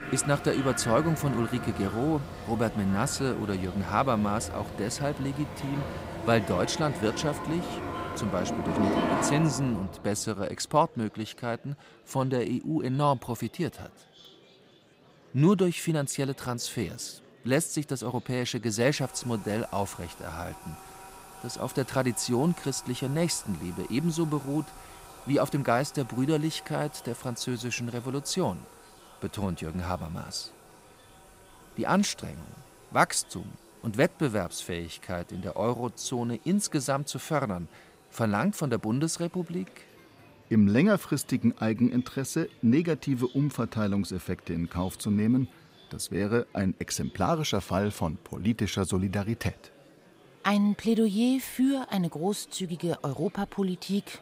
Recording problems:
household noises; loud; throughout; 9 dB below the speech
murmuring crowd; faint; throughout; 25 dB below the speech

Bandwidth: 15.5 kHz